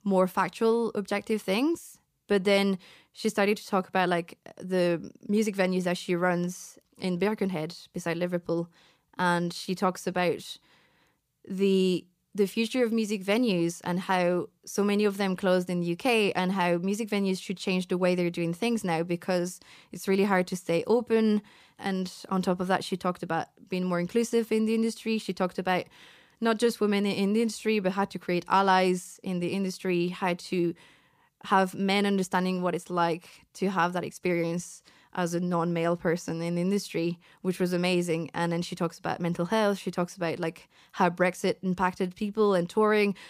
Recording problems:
none

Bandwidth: 15 kHz